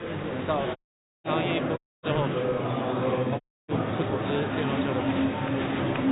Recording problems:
high frequencies cut off; severe; nothing above 4 kHz
murmuring crowd; very loud; throughout; 5 dB above the speech
audio cutting out; at 1 s, at 2 s and at 3.5 s

